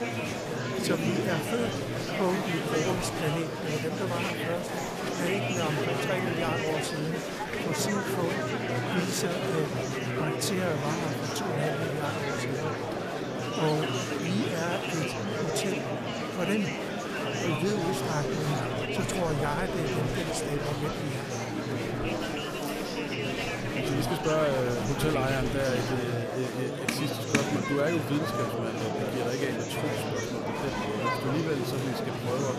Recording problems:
murmuring crowd; very loud; throughout; 2 dB above the speech

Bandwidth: 14.5 kHz